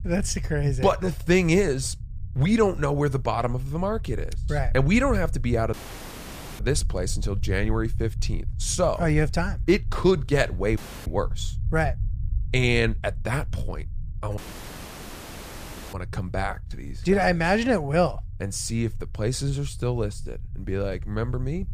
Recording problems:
low rumble; faint; throughout; 25 dB below the speech
audio cutting out; at 5.5 s for 1 s, at 11 s and at 14 s for 1.5 s

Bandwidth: 14.5 kHz